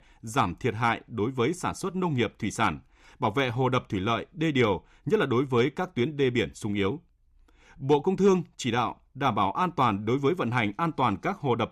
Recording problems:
none

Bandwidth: 14 kHz